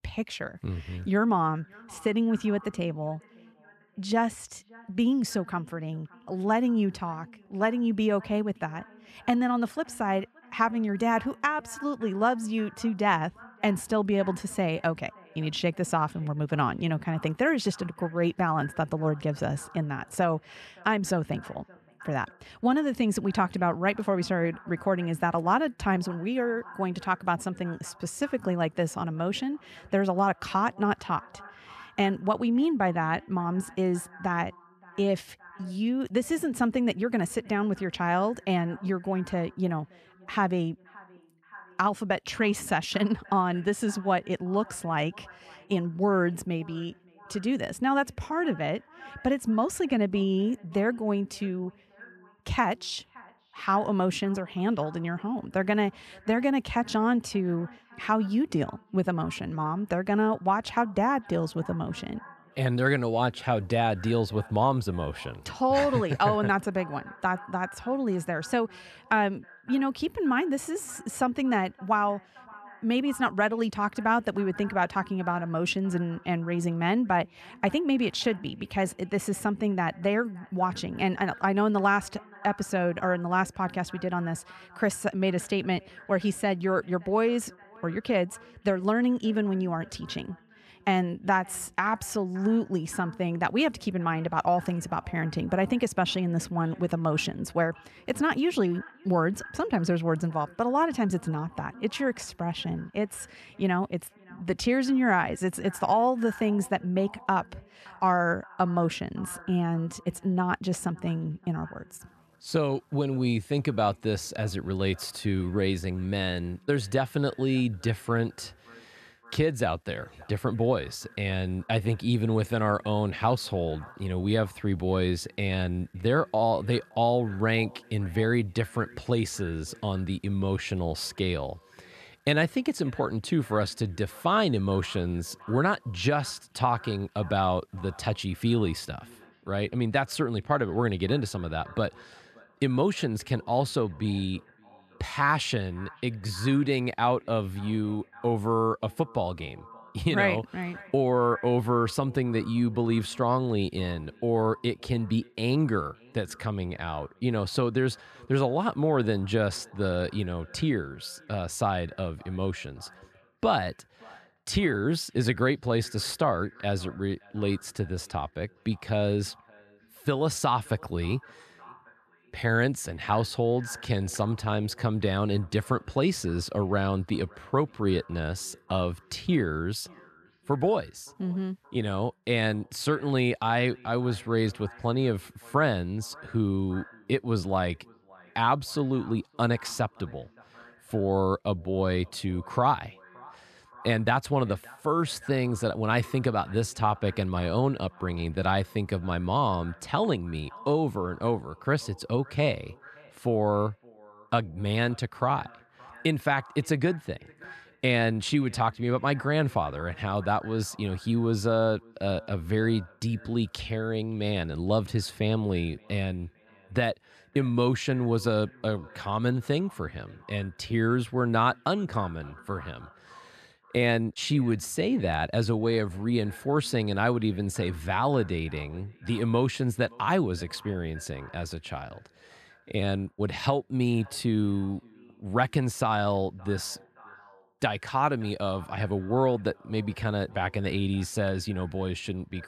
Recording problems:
echo of what is said; faint; throughout; 570 ms later, 25 dB below the speech

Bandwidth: 13.5 kHz